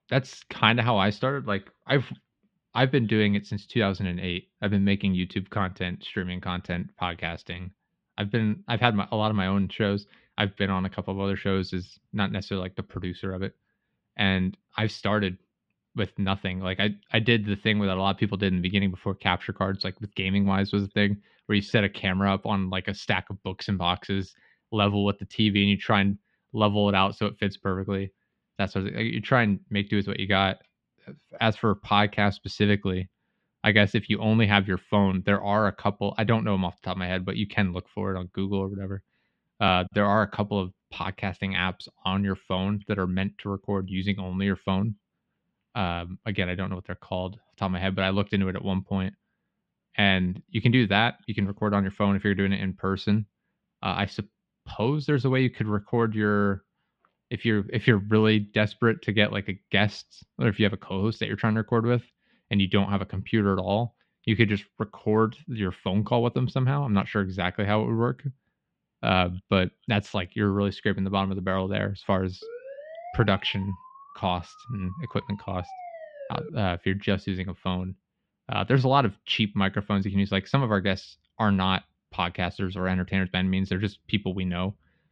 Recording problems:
muffled; very; fading above 3 kHz
siren; faint; from 1:12 to 1:17; peak 15 dB below the speech

